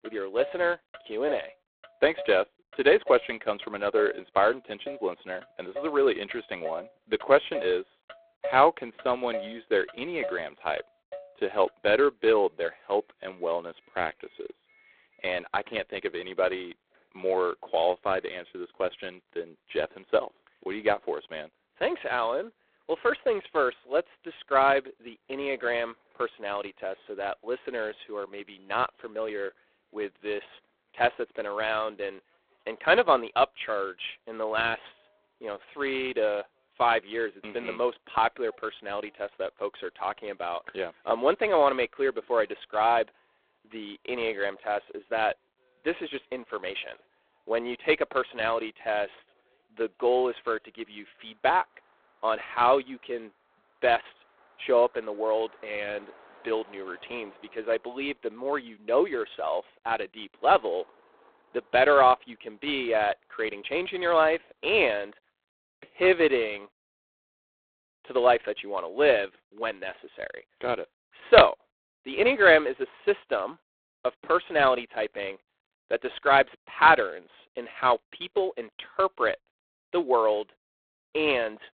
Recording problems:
phone-call audio; poor line; nothing above 4 kHz
traffic noise; noticeable; until 1:05; 15 dB below the speech

